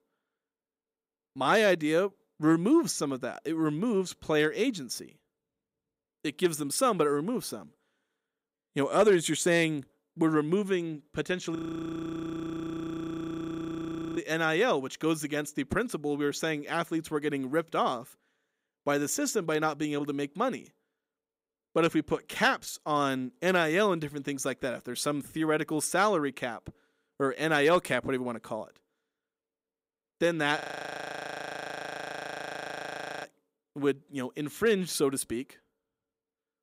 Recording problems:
audio freezing; at 12 s for 2.5 s and at 31 s for 2.5 s

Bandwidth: 15.5 kHz